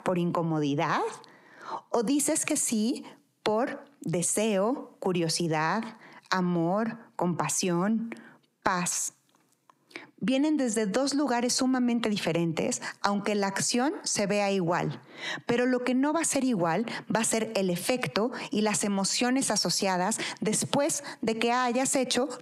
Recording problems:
squashed, flat; heavily

